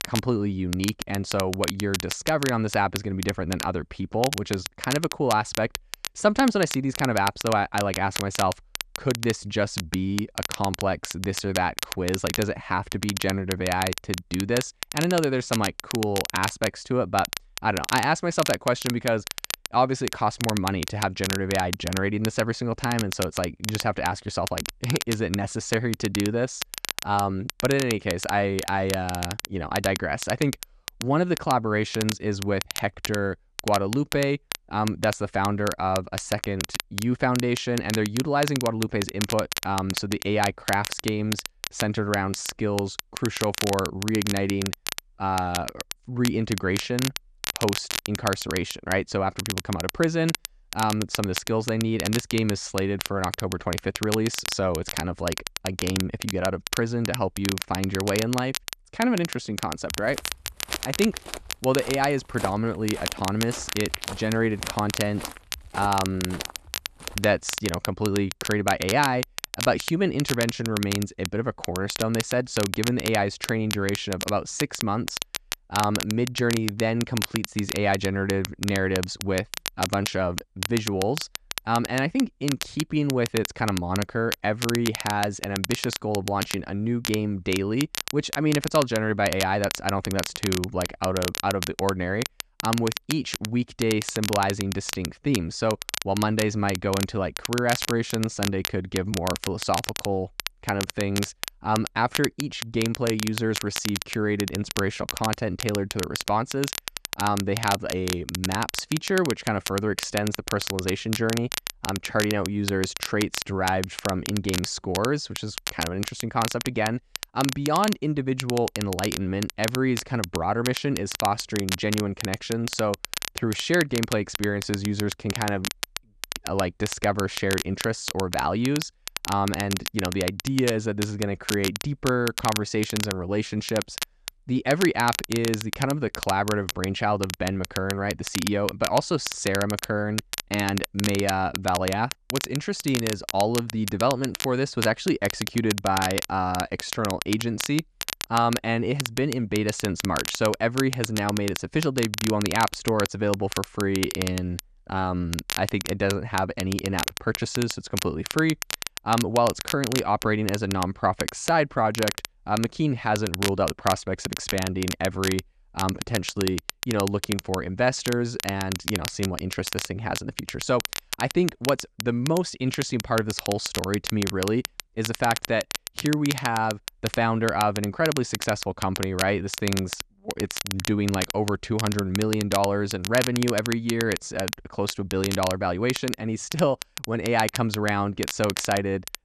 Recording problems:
crackle, like an old record; loud; 6 dB below the speech
footsteps; noticeable; from 1:00 to 1:07; peak 8 dB below the speech

